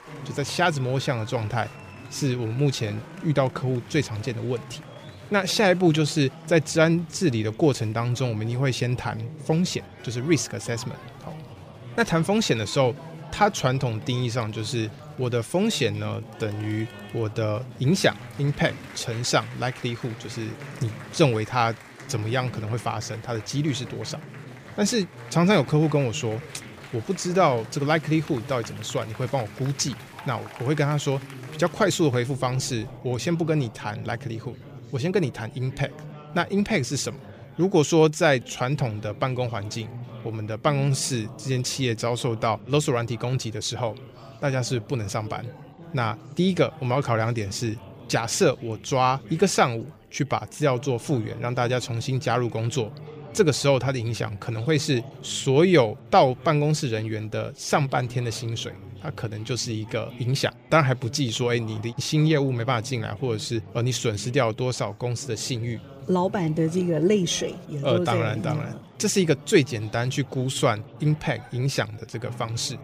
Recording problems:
chatter from many people; noticeable; throughout; 15 dB below the speech

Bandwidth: 15 kHz